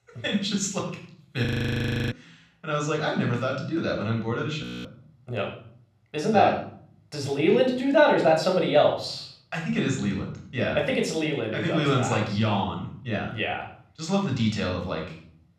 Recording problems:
room echo; slight; dies away in 0.6 s
off-mic speech; somewhat distant
audio freezing; at 1.5 s for 0.5 s and at 4.5 s

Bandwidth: 14.5 kHz